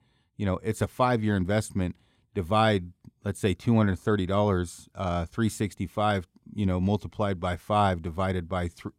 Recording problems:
none

